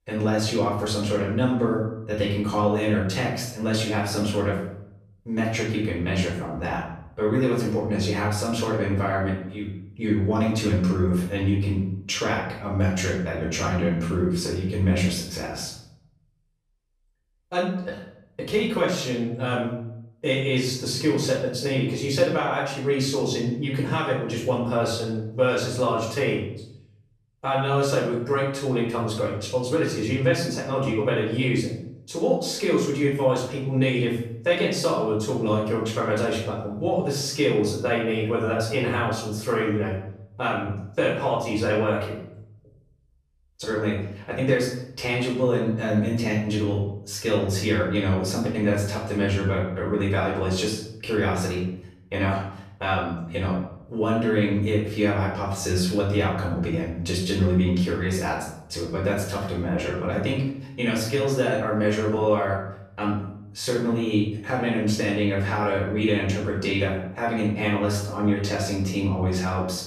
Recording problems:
off-mic speech; far
room echo; noticeable; dies away in 0.7 s

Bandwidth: 14.5 kHz